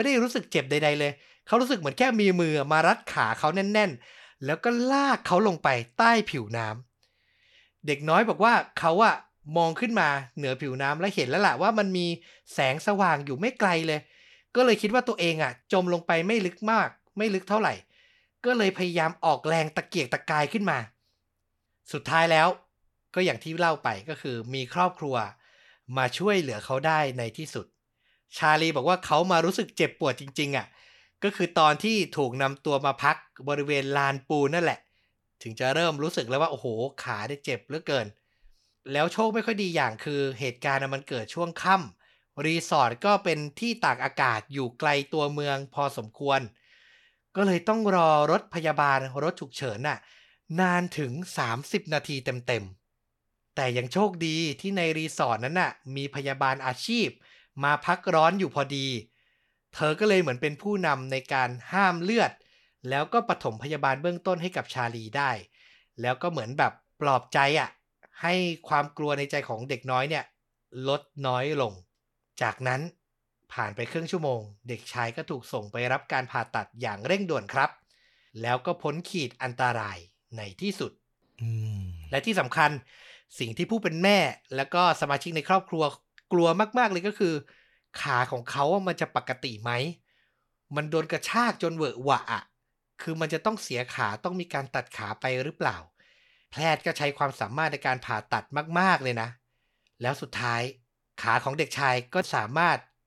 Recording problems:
abrupt cut into speech; at the start

